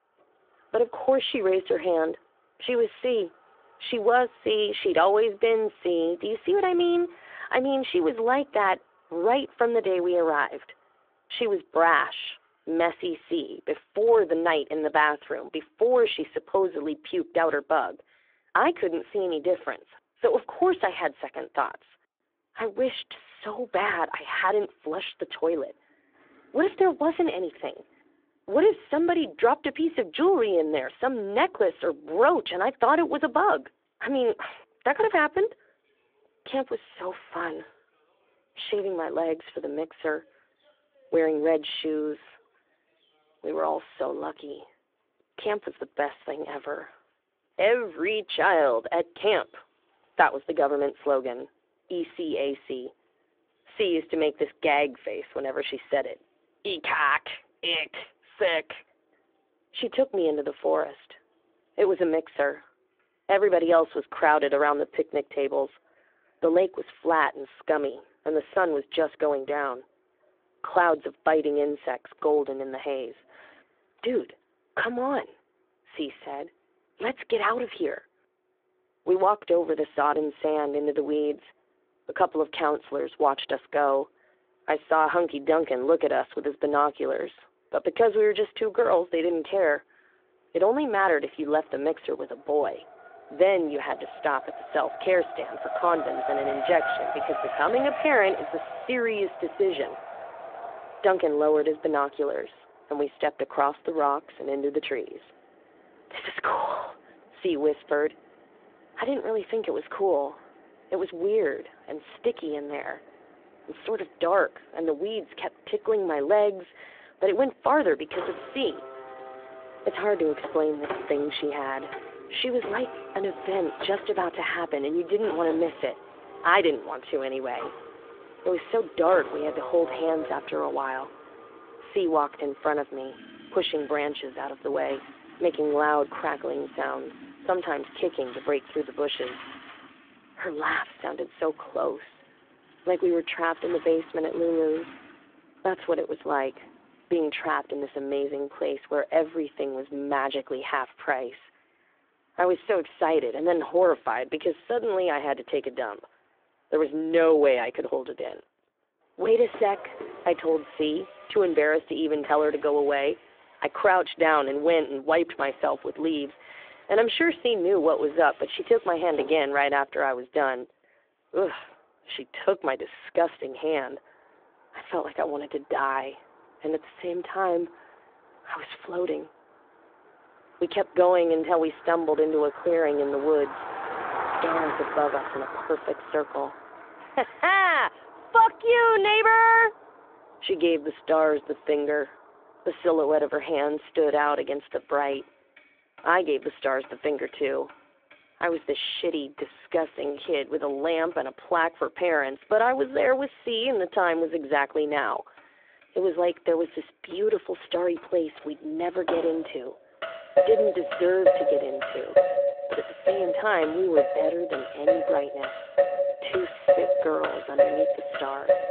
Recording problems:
phone-call audio
traffic noise; loud; throughout; 6 dB below the speech

